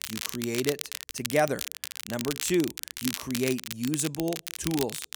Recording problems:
crackle, like an old record; loud; 5 dB below the speech

